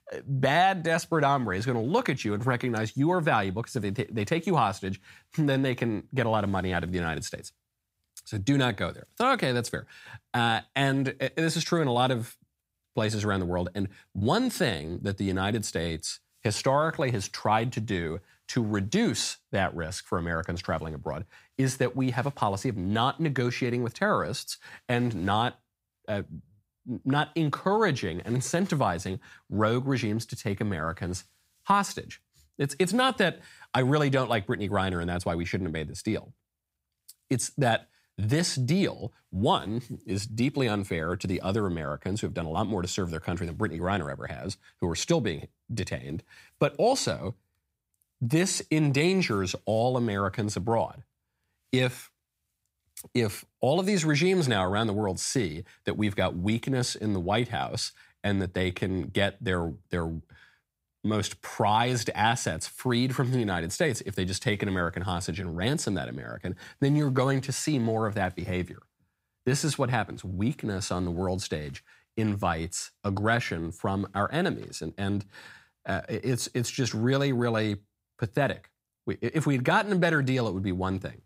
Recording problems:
none

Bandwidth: 15.5 kHz